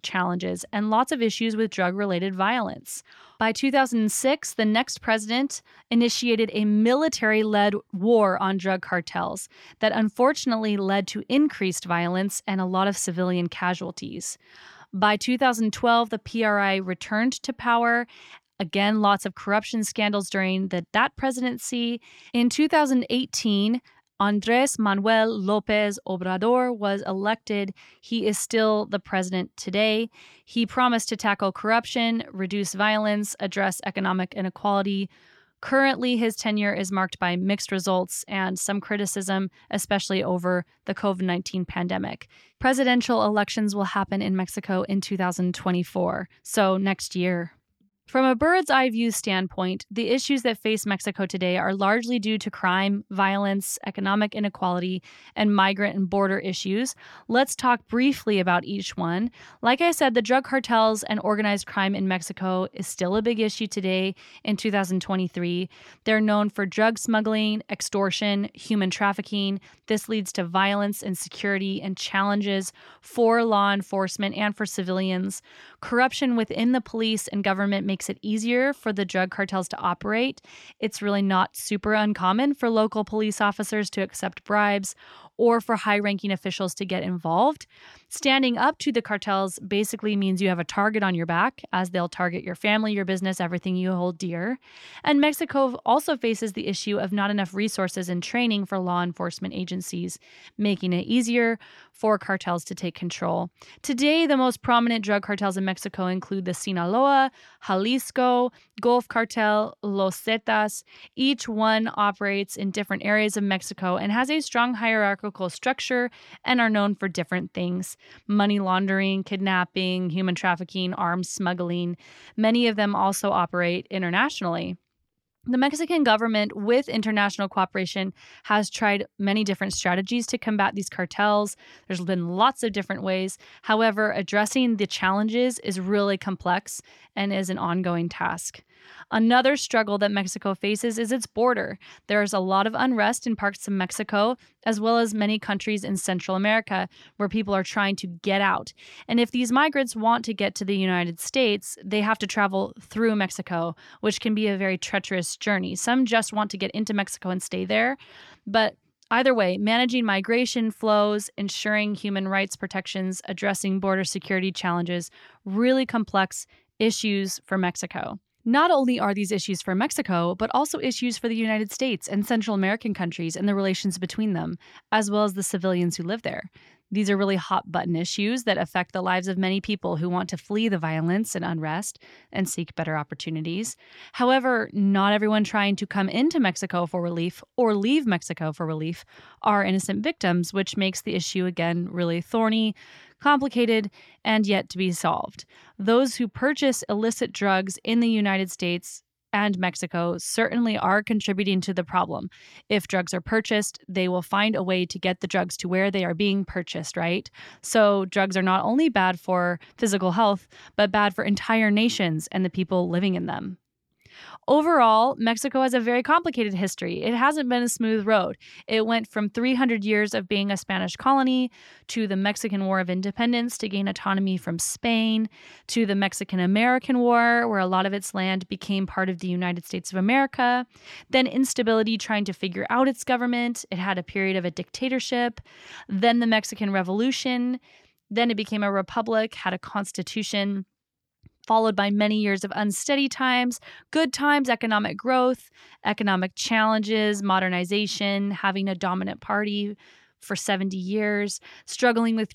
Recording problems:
none

